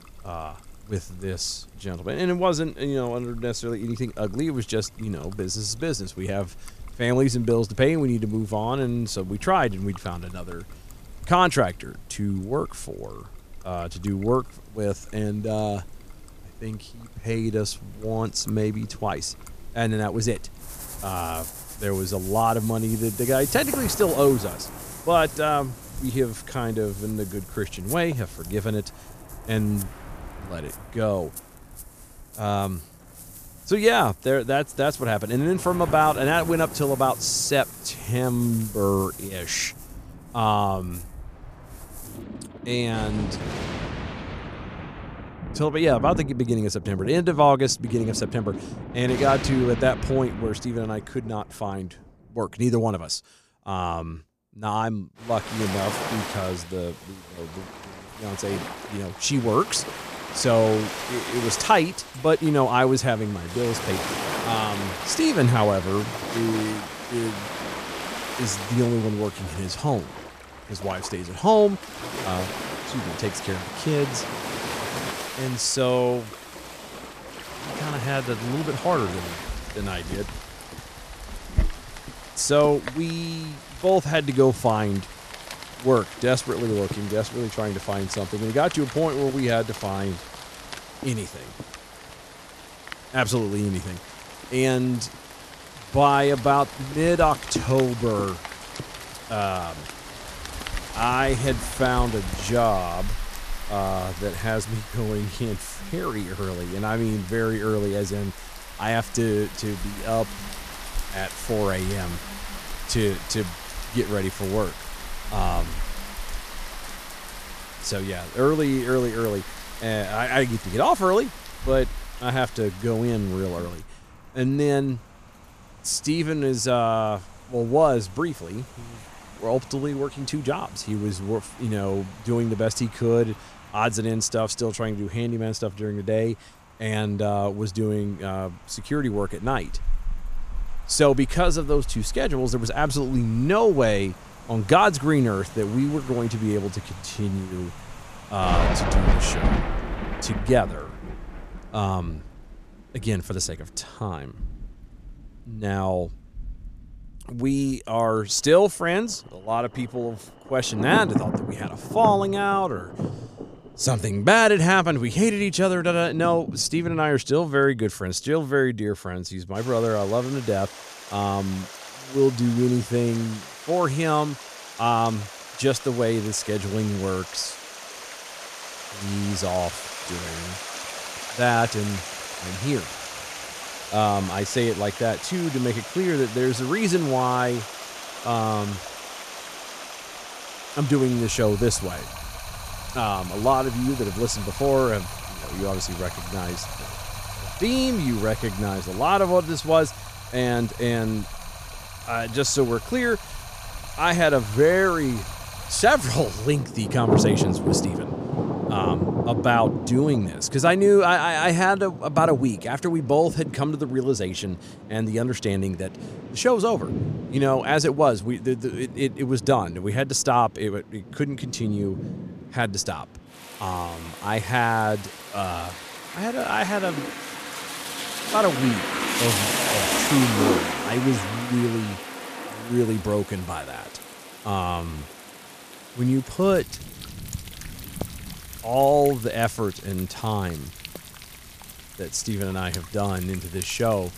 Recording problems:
rain or running water; loud; throughout; 9 dB below the speech

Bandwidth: 14.5 kHz